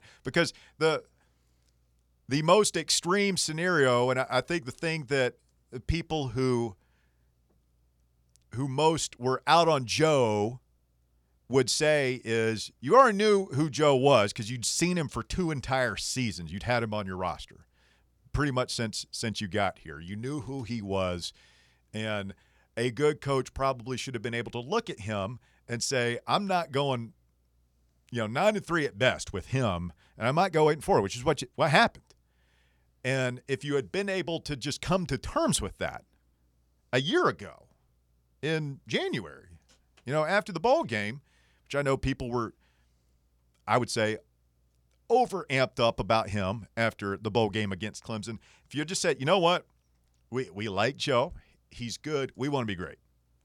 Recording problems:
none

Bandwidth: 18.5 kHz